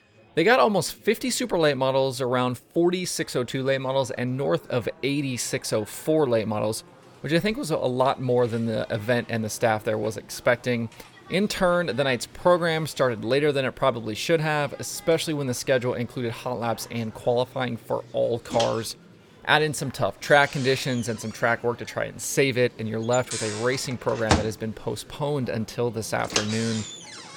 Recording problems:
household noises; loud; throughout; 7 dB below the speech
chatter from many people; faint; throughout; 25 dB below the speech

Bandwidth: 18 kHz